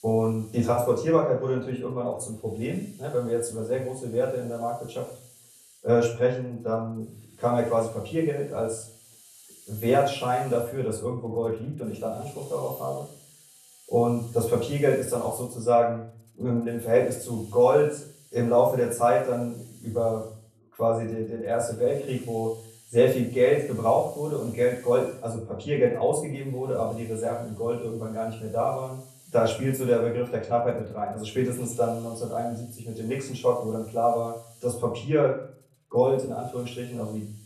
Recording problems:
off-mic speech; far
room echo; slight; dies away in 0.4 s
hiss; faint; throughout; 25 dB below the speech

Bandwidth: 13.5 kHz